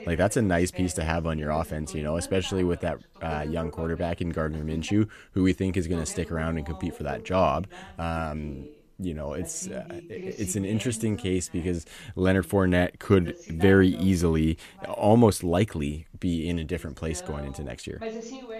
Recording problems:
voice in the background; noticeable; throughout; 15 dB below the speech

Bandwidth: 14.5 kHz